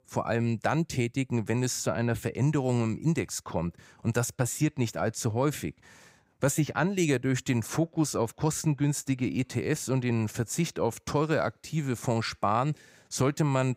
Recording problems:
none

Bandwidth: 15.5 kHz